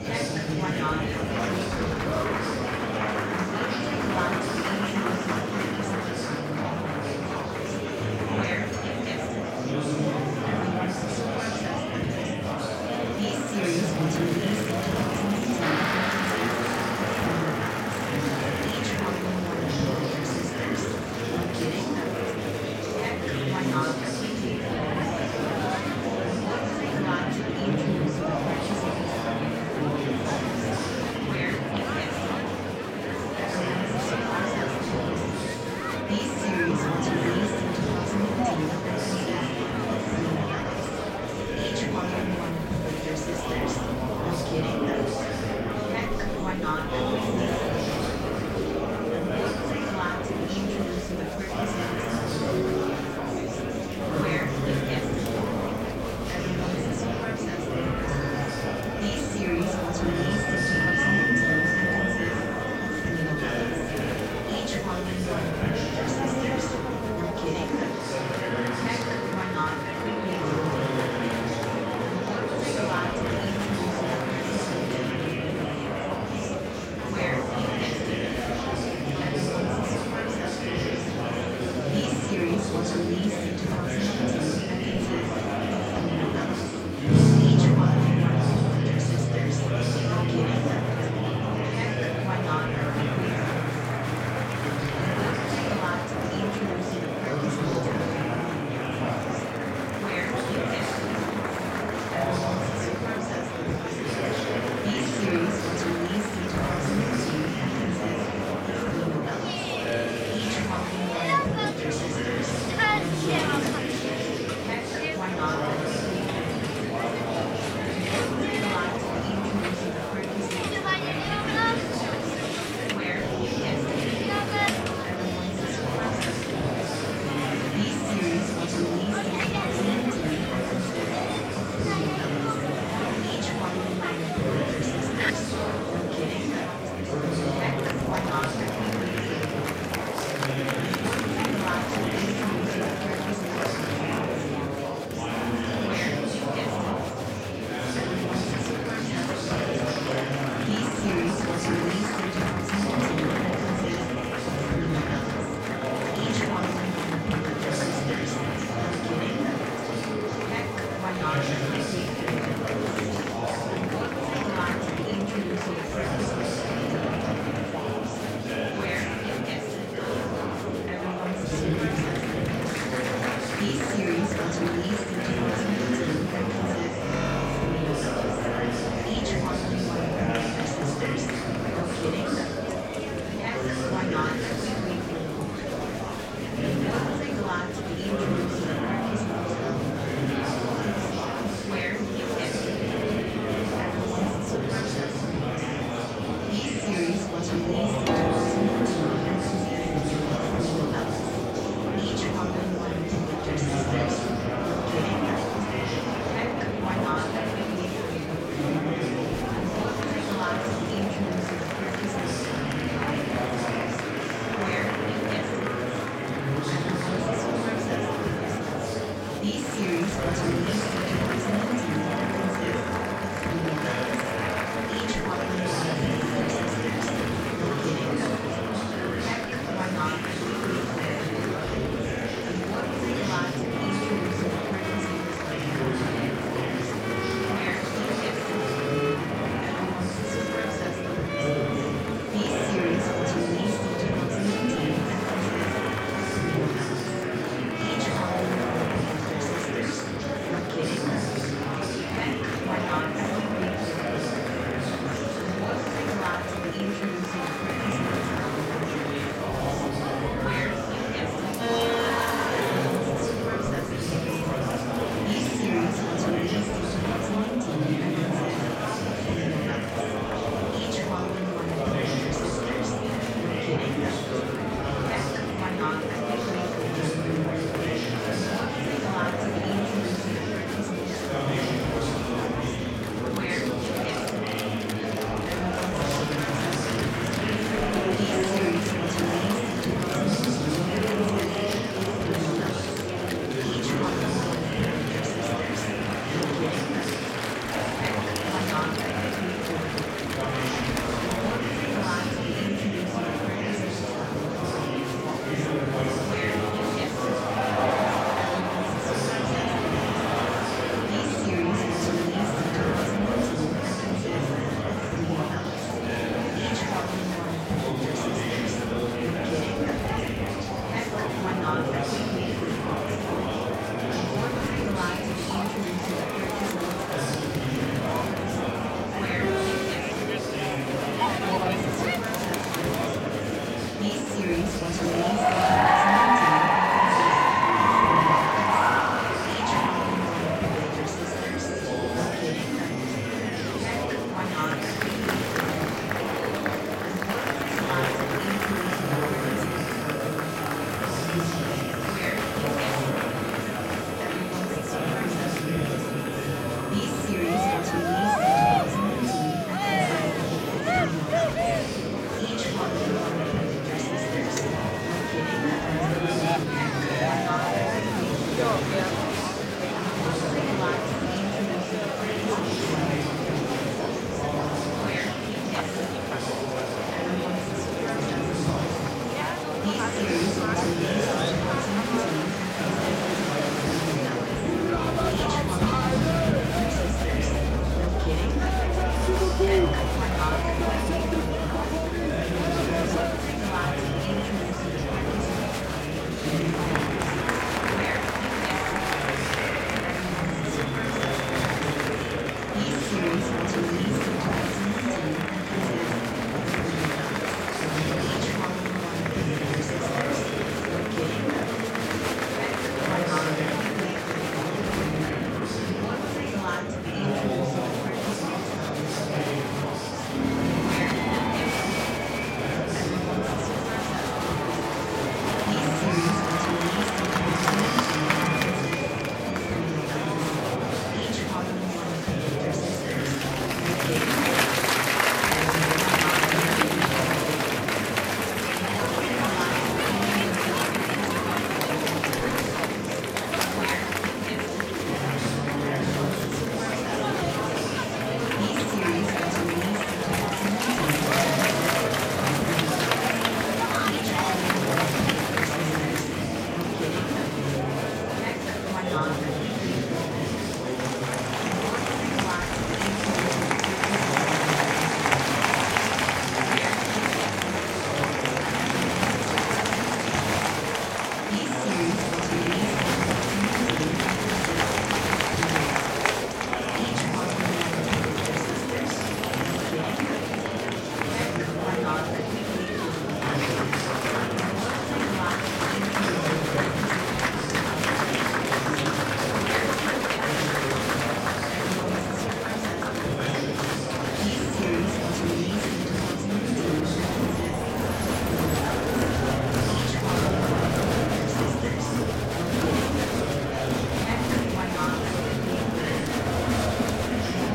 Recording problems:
room echo; strong; dies away in 2.8 s
off-mic speech; far
murmuring crowd; very loud; throughout; 5 dB above the speech
background music; loud; throughout; 4 dB below the speech

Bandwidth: 16 kHz